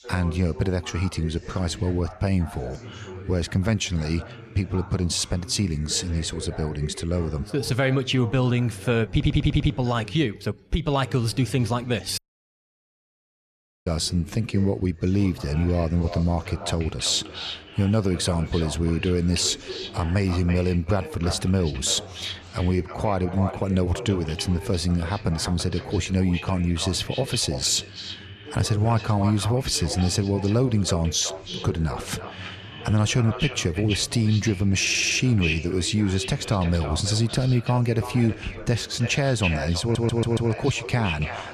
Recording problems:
echo of what is said; noticeable; from 15 s on; 330 ms later, 10 dB below the speech
background chatter; noticeable; throughout; 2 voices, 15 dB below the speech
audio stuttering; at 9 s, at 35 s and at 40 s
audio cutting out; at 12 s for 1.5 s

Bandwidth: 13.5 kHz